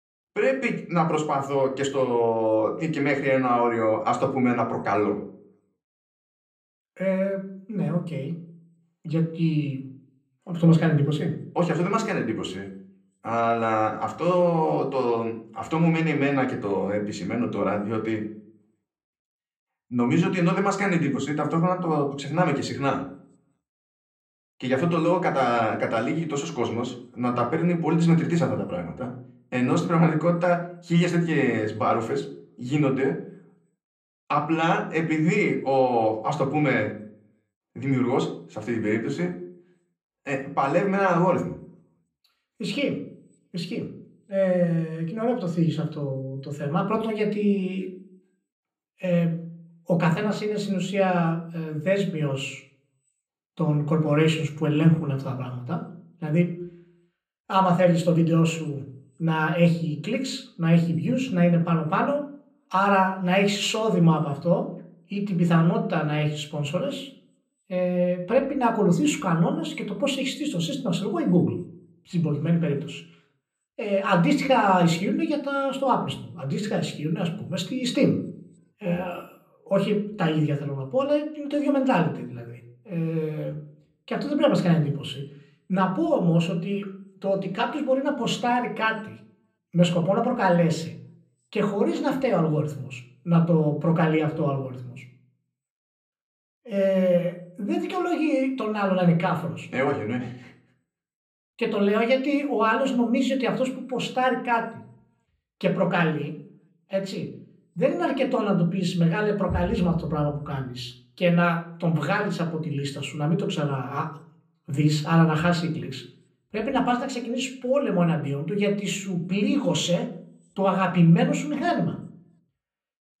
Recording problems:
room echo; slight; dies away in 0.6 s
off-mic speech; somewhat distant

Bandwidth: 14.5 kHz